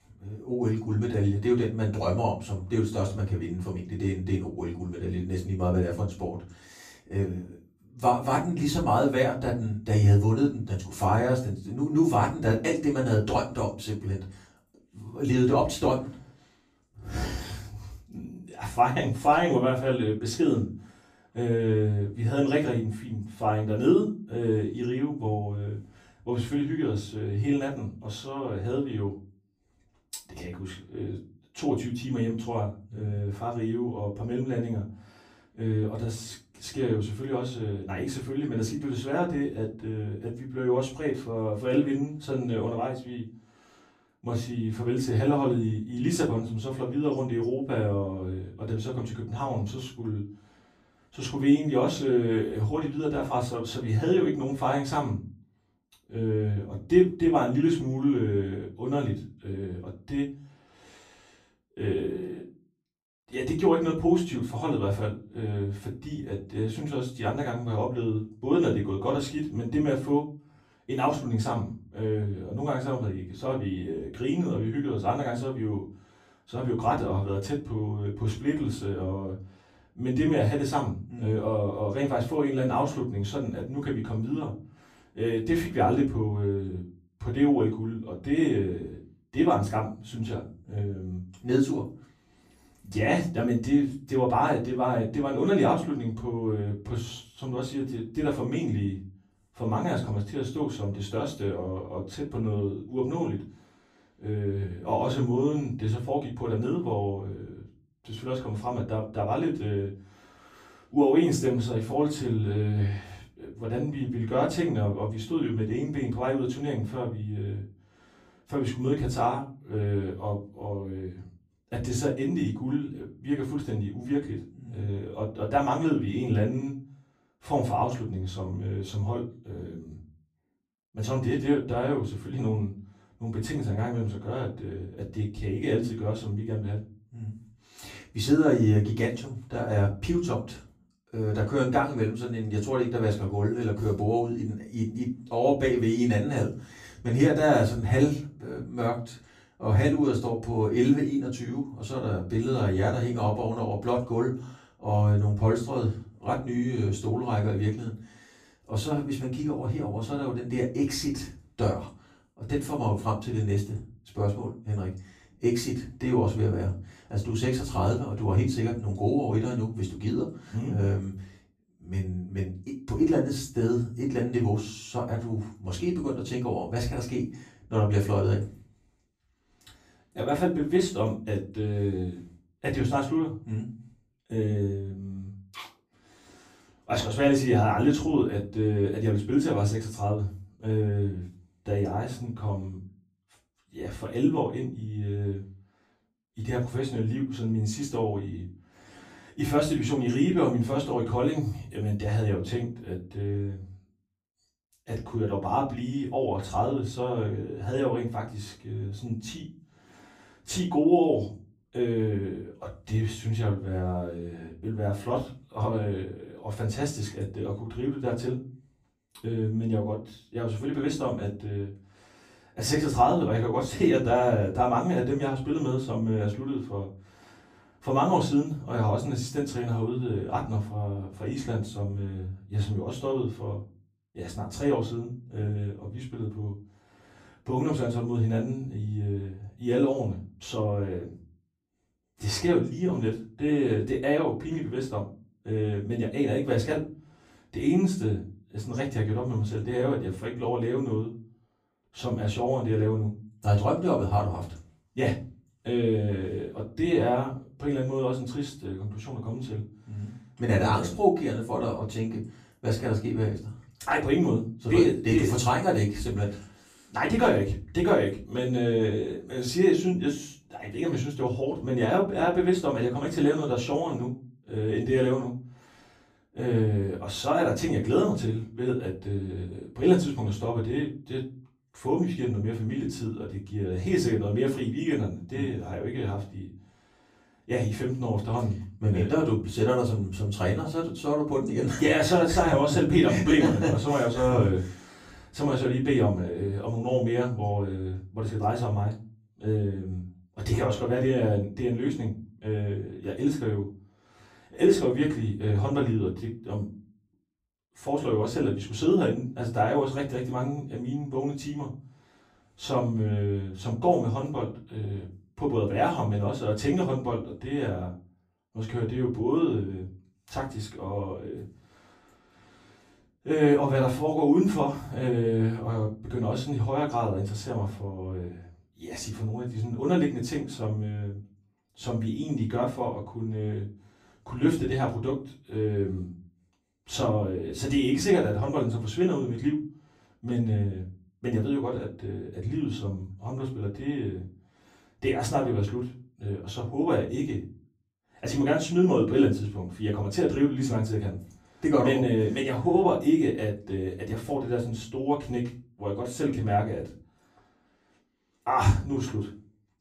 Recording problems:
off-mic speech; far
room echo; slight; dies away in 0.3 s

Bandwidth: 15 kHz